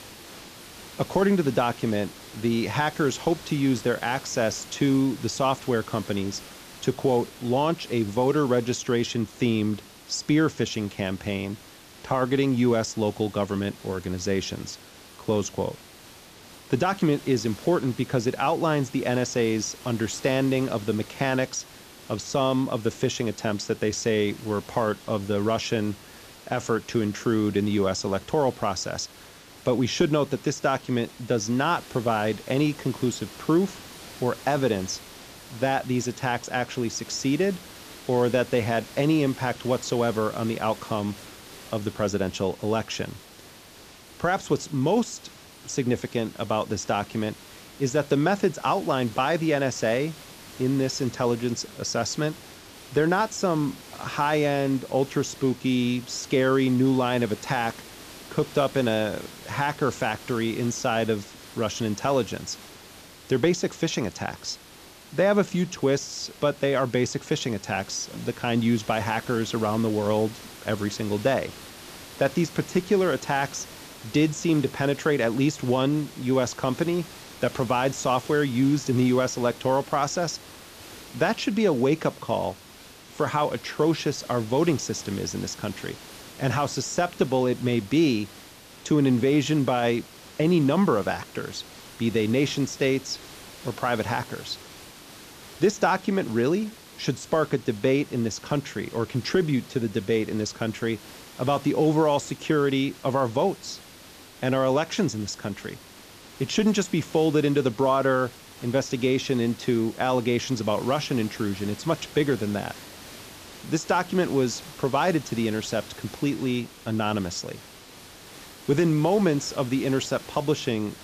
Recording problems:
high frequencies cut off; noticeable; nothing above 8 kHz
hiss; noticeable; throughout; 20 dB below the speech

